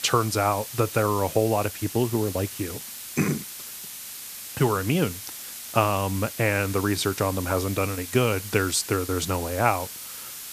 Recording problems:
hiss; loud; throughout; 10 dB below the speech

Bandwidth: 14.5 kHz